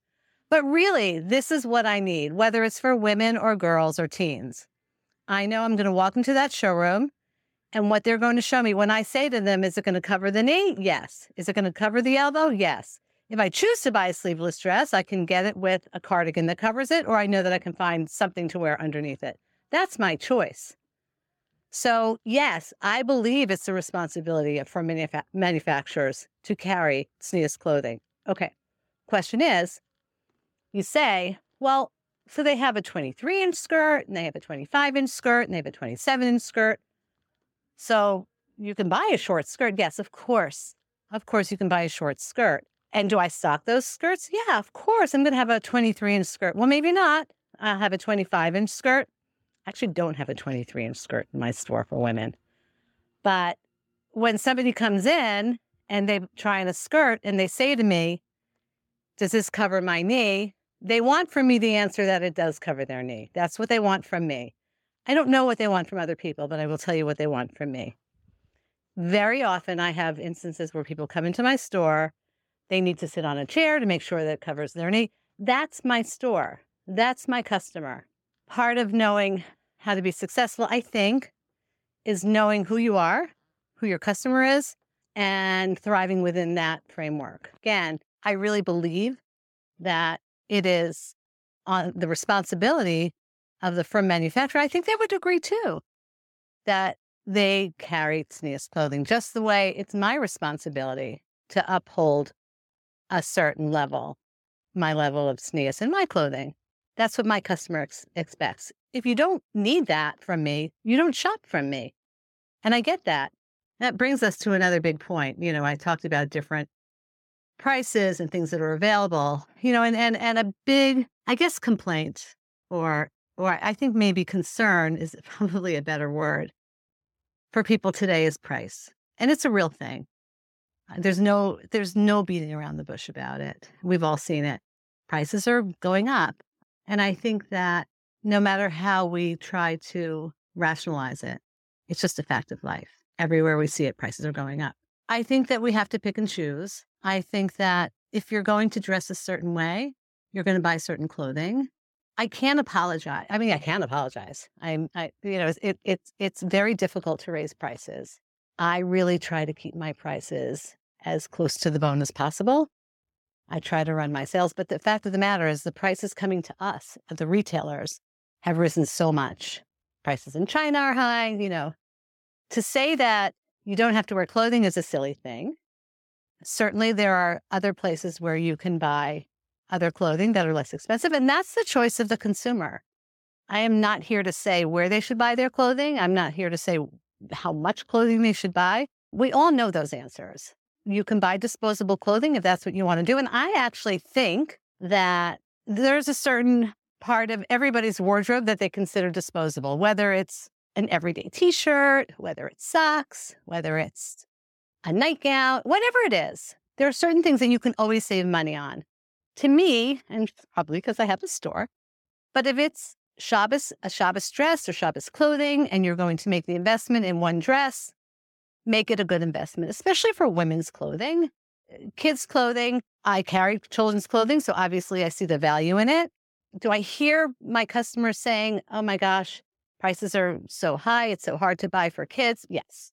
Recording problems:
none

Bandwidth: 17 kHz